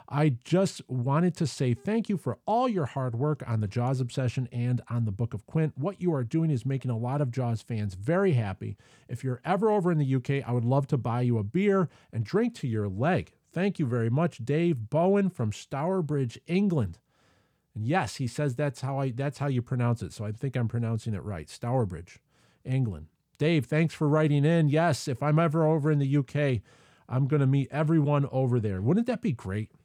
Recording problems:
none

